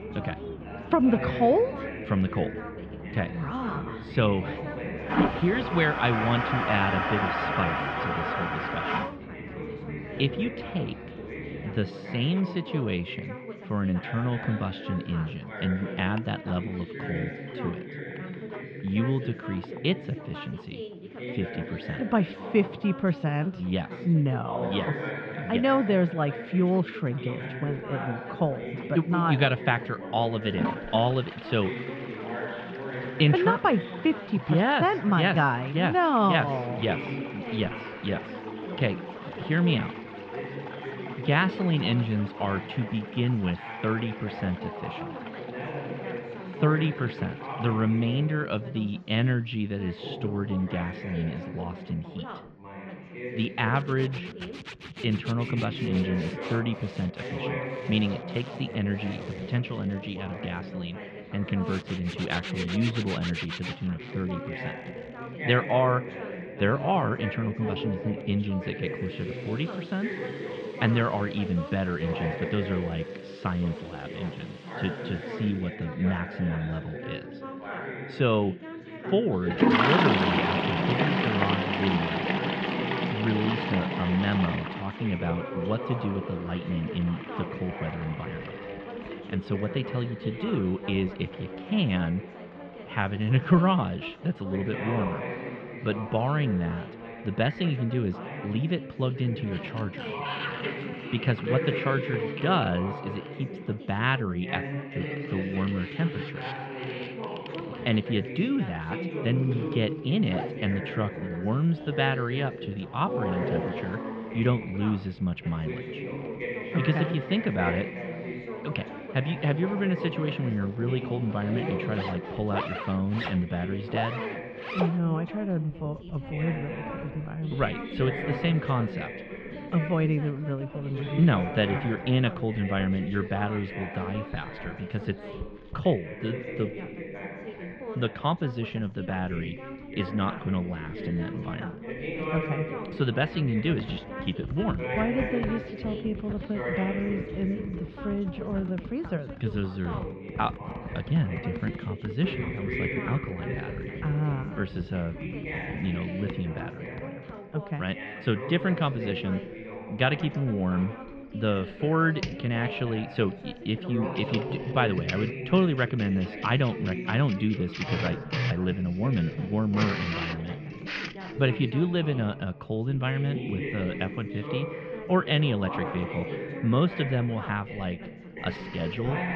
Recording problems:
muffled; slightly; fading above 3 kHz
household noises; loud; throughout; 7 dB below the speech
background chatter; loud; throughout; 2 voices, 8 dB below the speech

